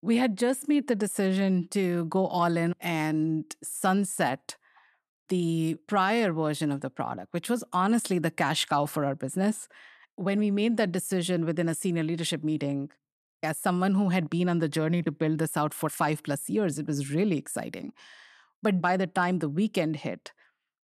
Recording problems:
none

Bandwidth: 13.5 kHz